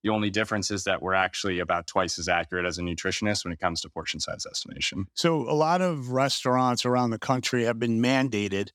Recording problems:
none

